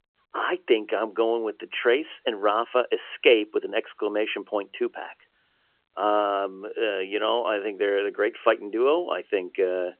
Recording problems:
phone-call audio; nothing above 3 kHz

